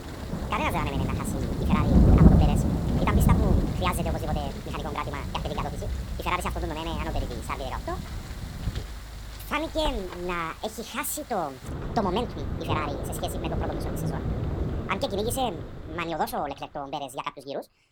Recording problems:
wrong speed and pitch; too fast and too high; 1.7 times normal speed
rain or running water; very loud; throughout; 4 dB above the speech

